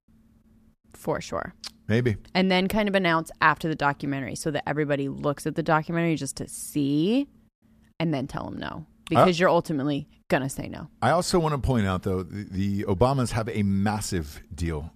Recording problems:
none

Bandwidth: 14.5 kHz